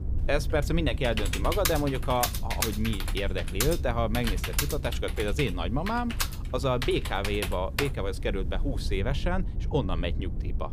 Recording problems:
low rumble; noticeable; throughout; 20 dB below the speech
keyboard typing; loud; from 1 to 8 s; peak 1 dB above the speech

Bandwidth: 15 kHz